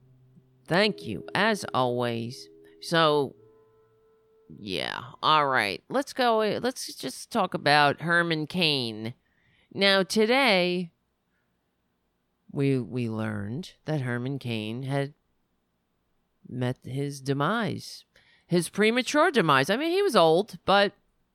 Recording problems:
background music; faint; until 4.5 s; 25 dB below the speech

